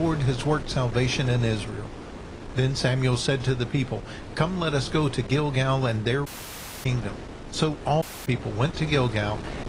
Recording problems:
garbled, watery; slightly
wind noise on the microphone; occasional gusts; 15 dB below the speech
abrupt cut into speech; at the start
audio cutting out; at 6.5 s for 0.5 s and at 8 s

